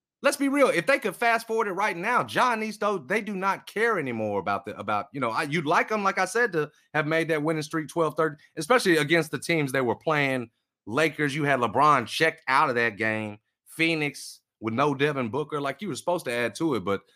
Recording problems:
none

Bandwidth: 15 kHz